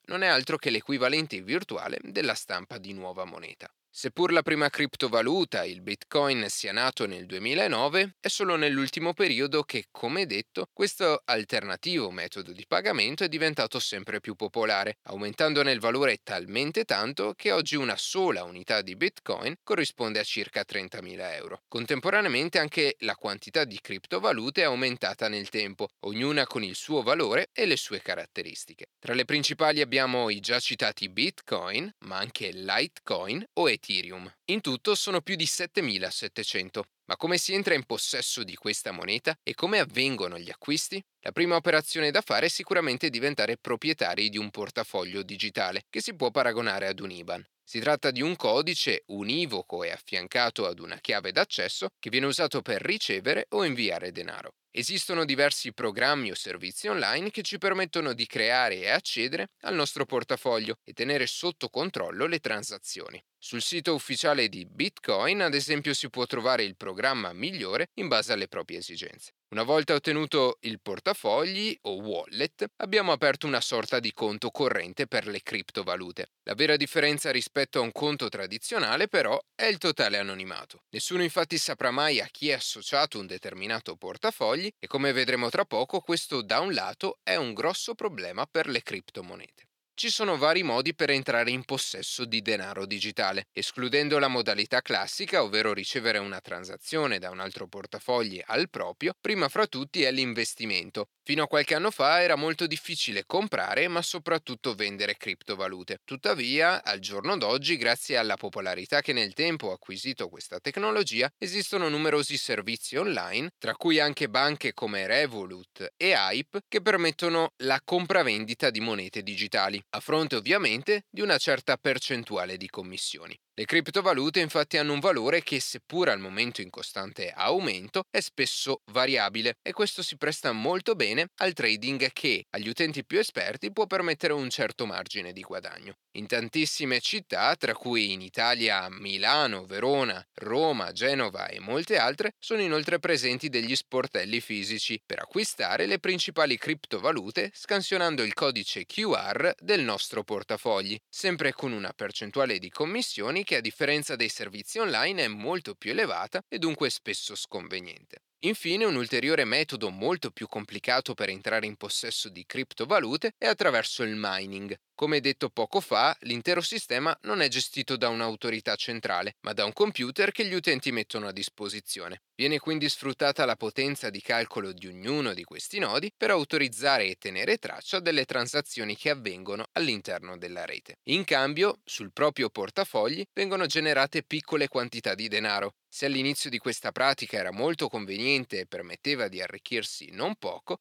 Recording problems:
thin; somewhat; fading below 350 Hz

